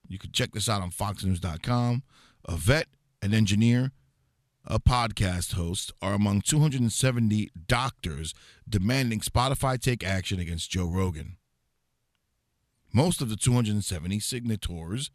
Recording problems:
none

